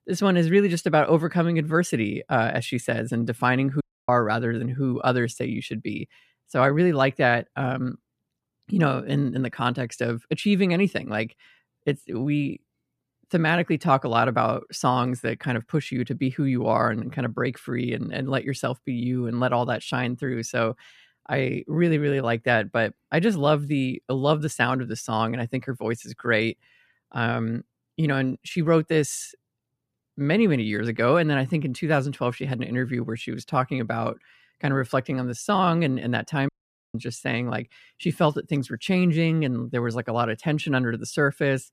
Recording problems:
audio cutting out; at 4 s and at 36 s

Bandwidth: 14.5 kHz